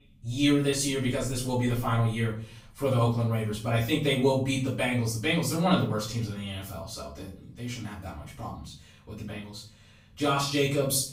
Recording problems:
off-mic speech; far
room echo; noticeable; dies away in 0.4 s

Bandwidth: 15.5 kHz